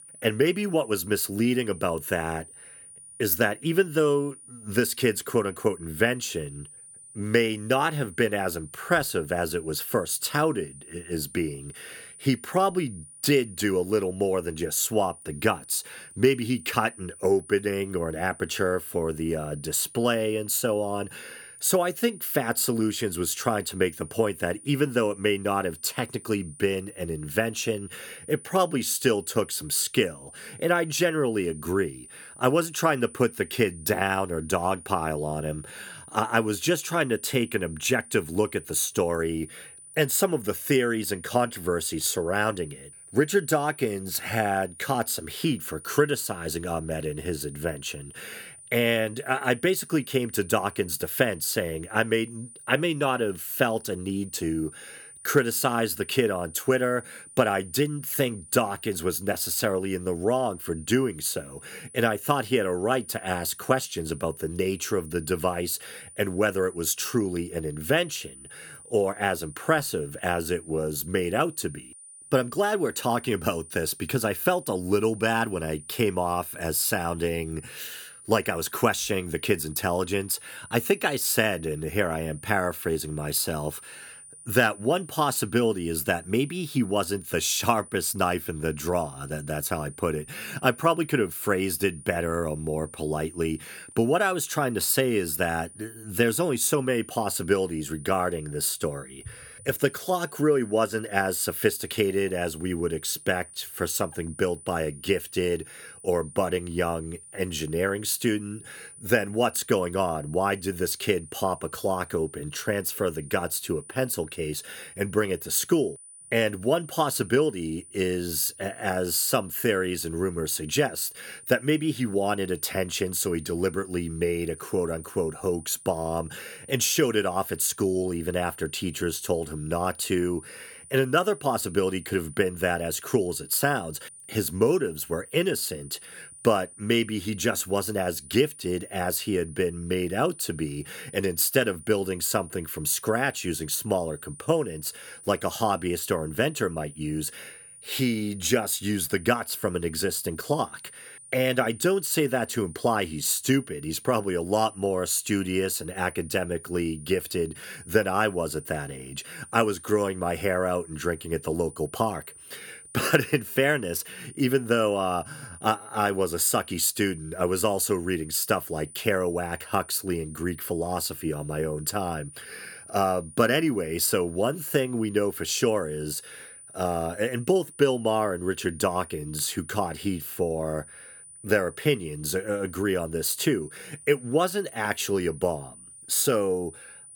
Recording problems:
high-pitched whine; noticeable; throughout; 9.5 kHz, 20 dB below the speech

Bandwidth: 18.5 kHz